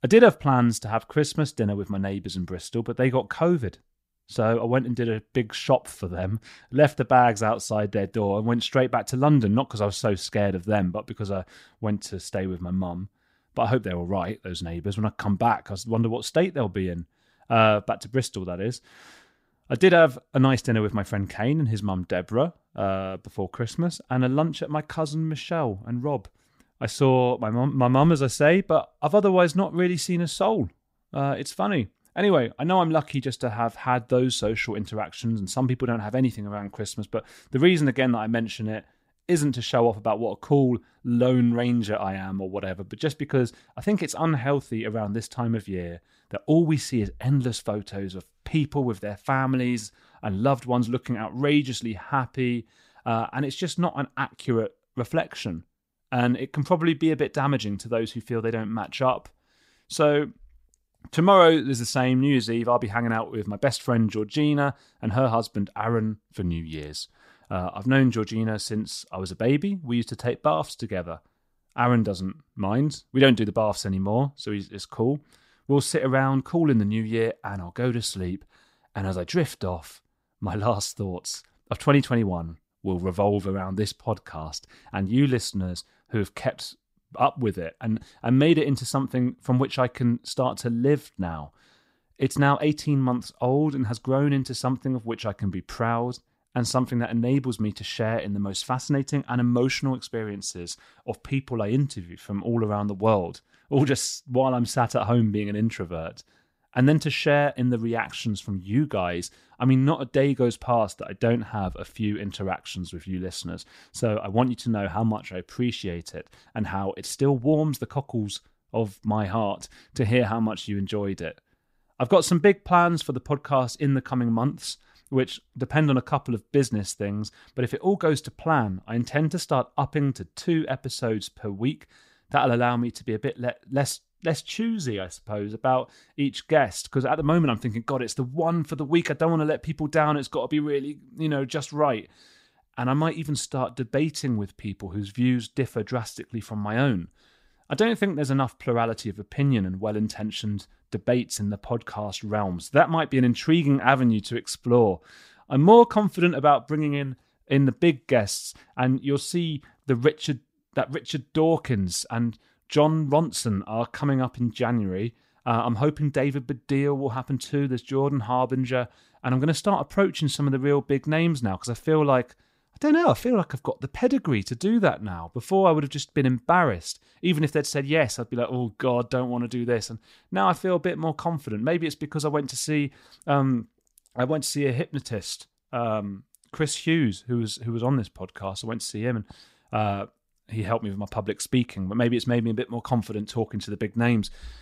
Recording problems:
none

